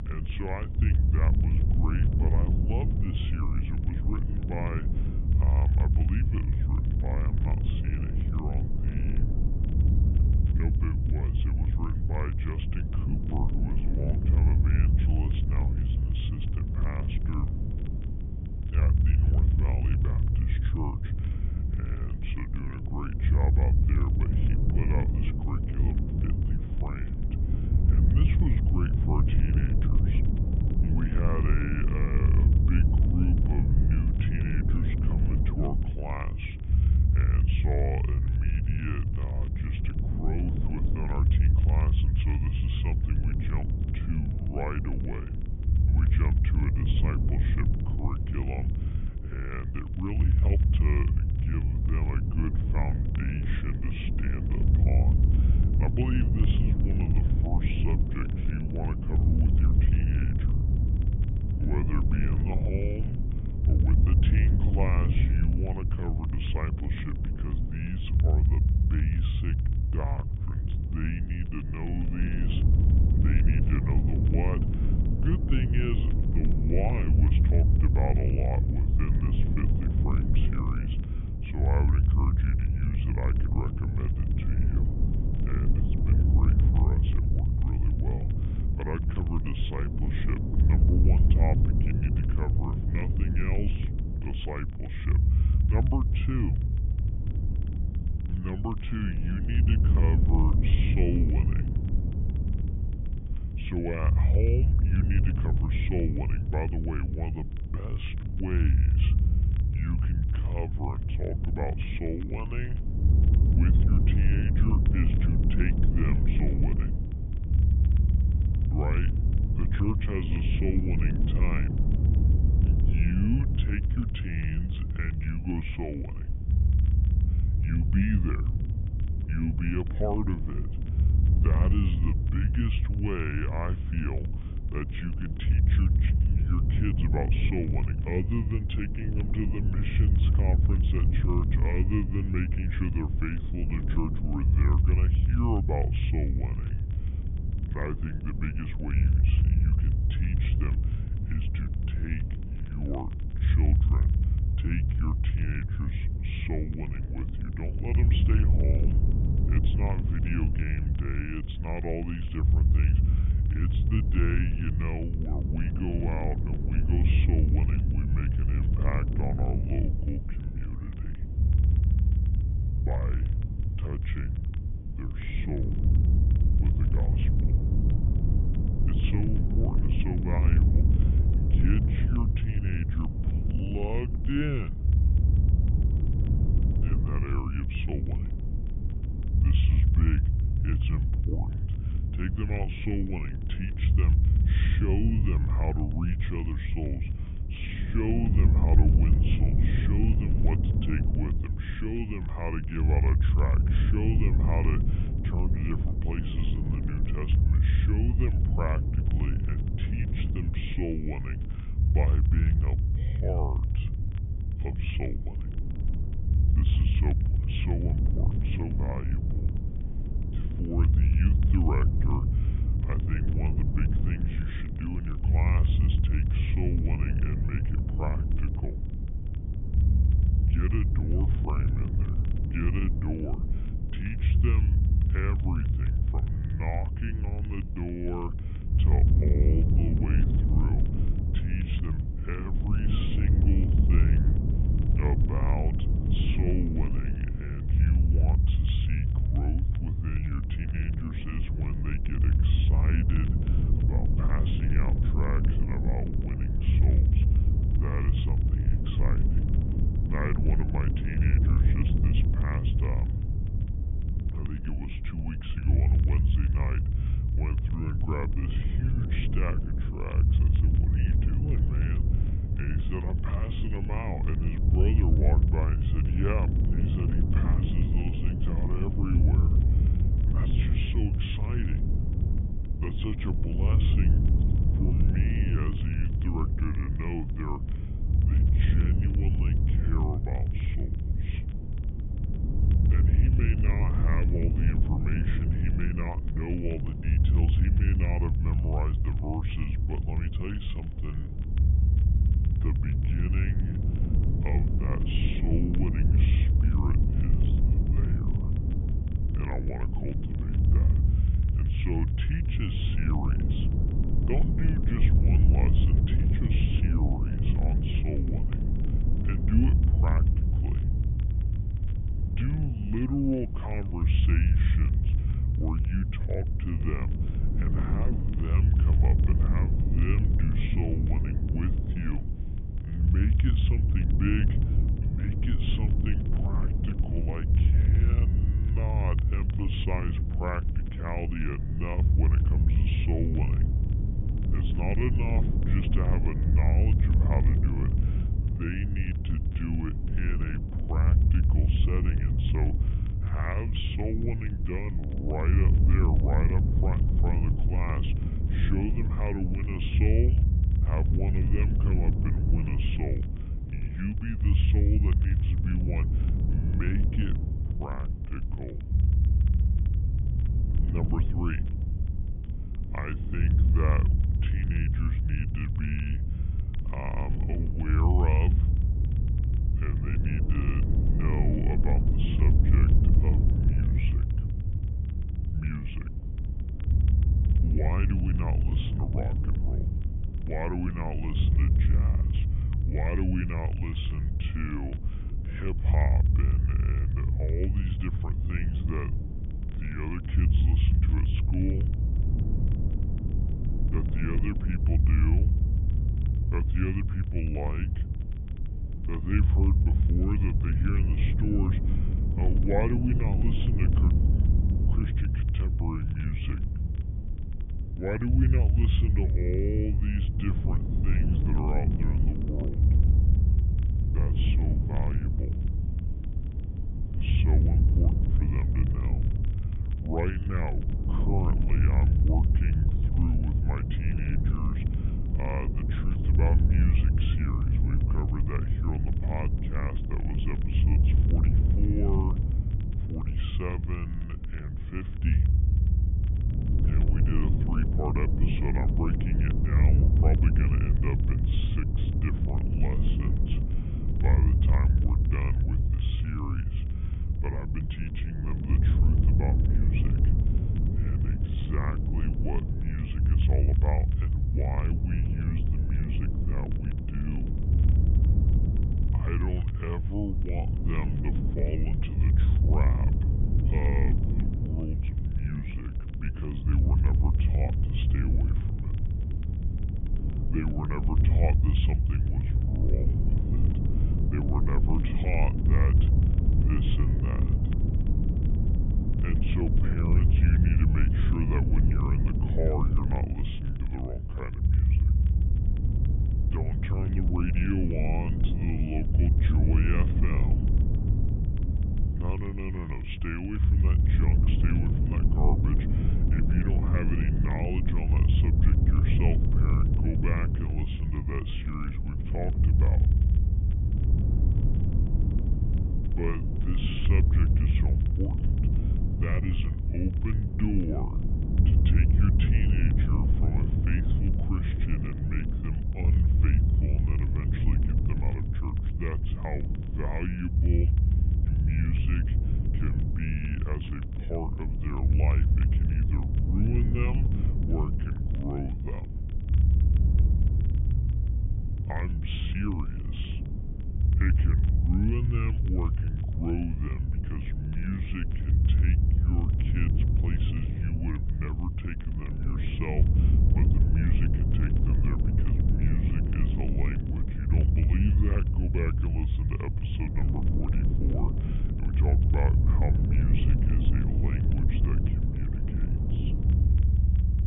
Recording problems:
high frequencies cut off; severe; nothing above 3.5 kHz
wrong speed and pitch; too slow and too low; 0.7 times normal speed
low rumble; loud; throughout; 2 dB below the speech
hiss; faint; throughout; 25 dB below the speech
crackle, like an old record; faint; 30 dB below the speech

